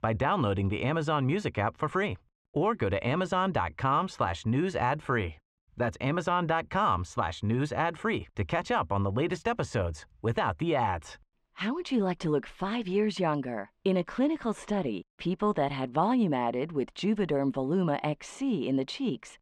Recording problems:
muffled; very; fading above 2.5 kHz

